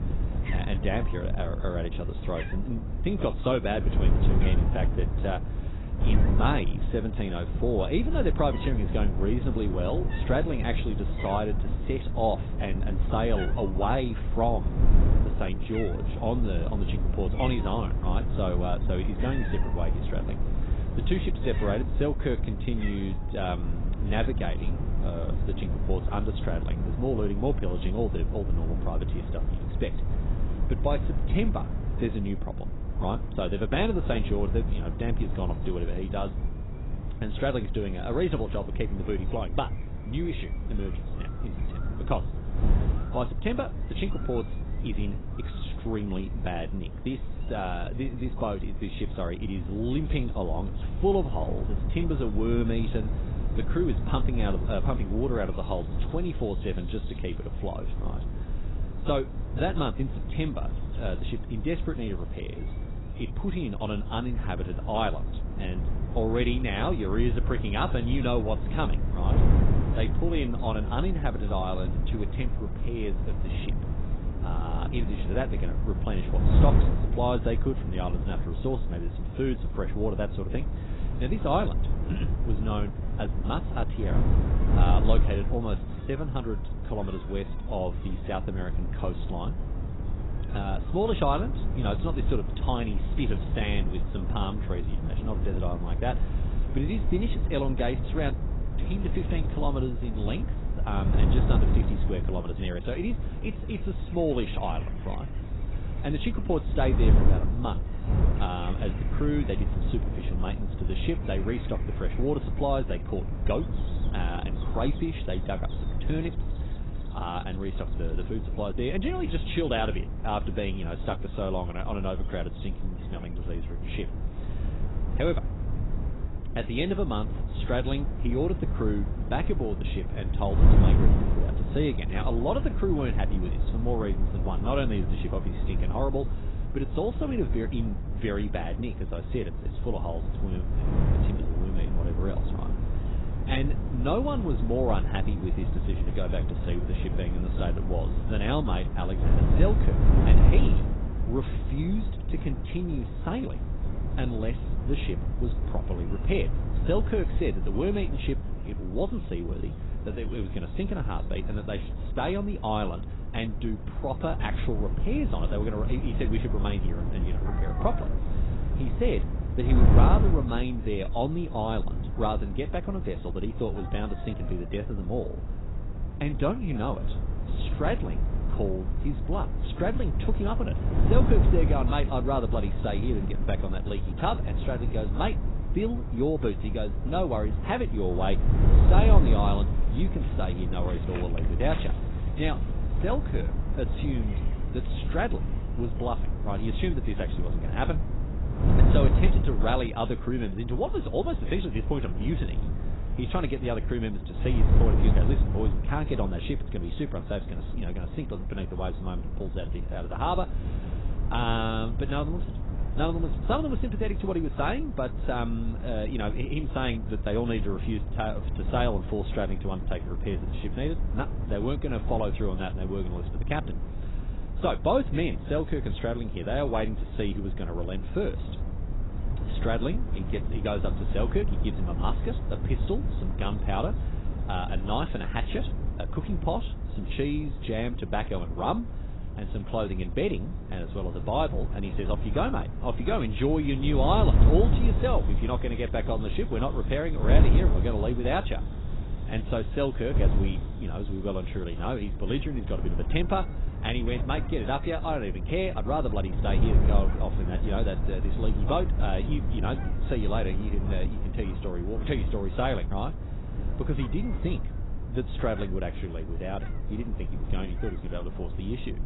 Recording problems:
garbled, watery; badly; nothing above 4 kHz
wind noise on the microphone; heavy; 9 dB below the speech
animal sounds; faint; throughout; 25 dB below the speech

